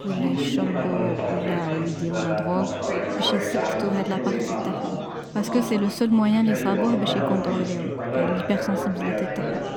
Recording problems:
chatter from many people; loud; throughout; 1 dB below the speech

